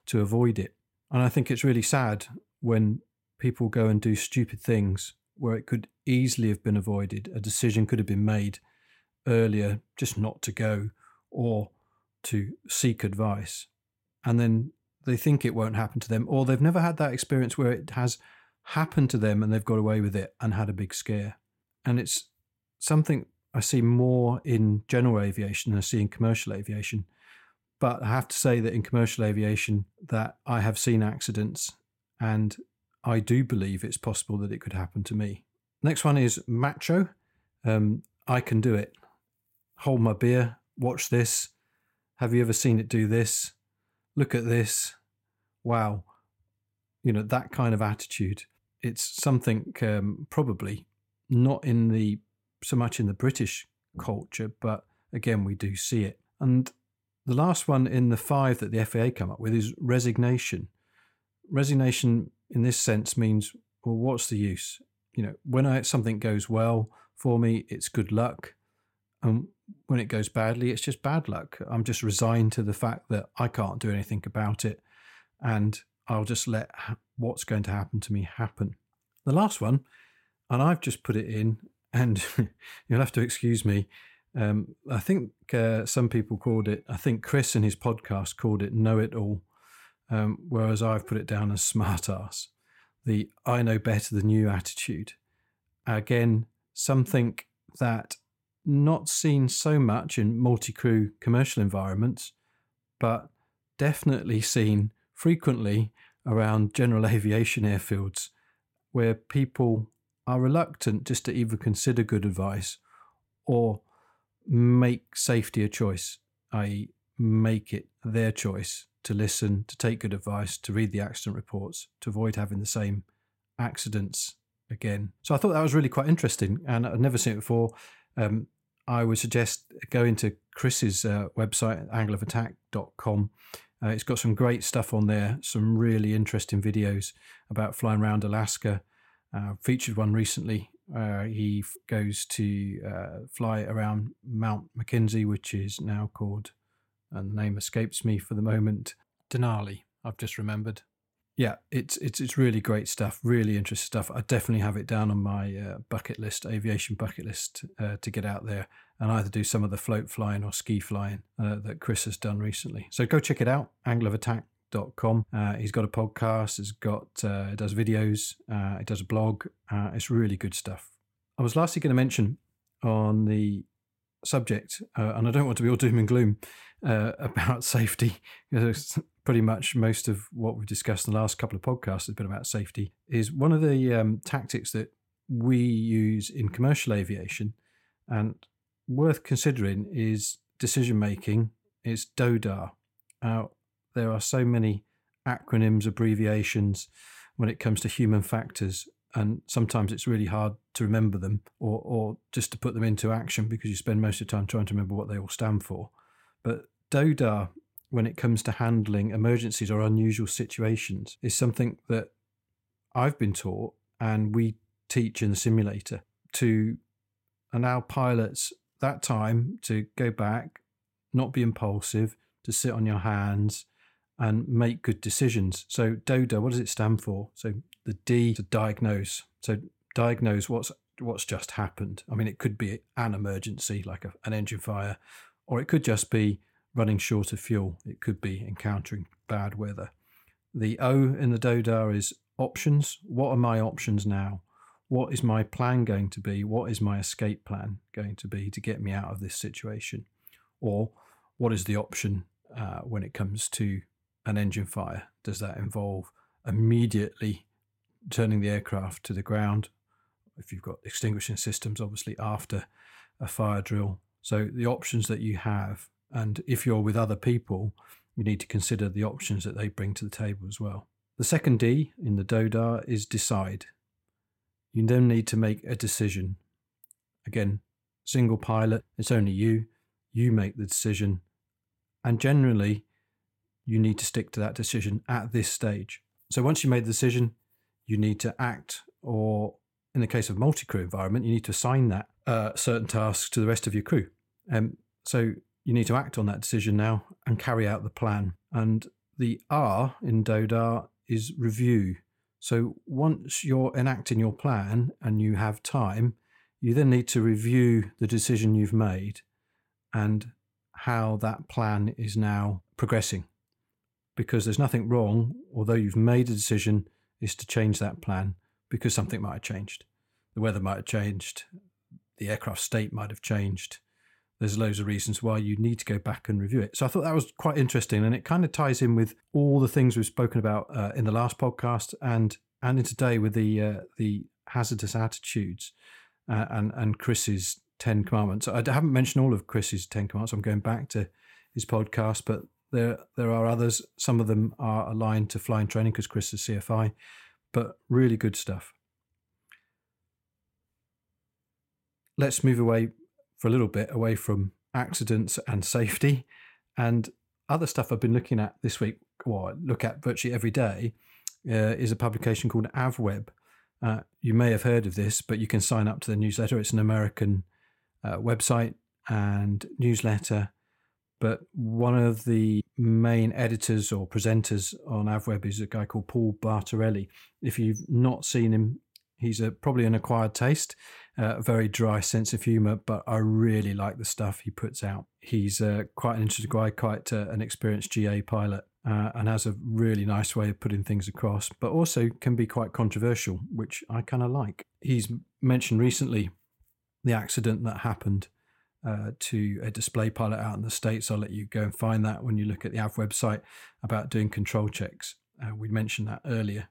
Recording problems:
none

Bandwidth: 16.5 kHz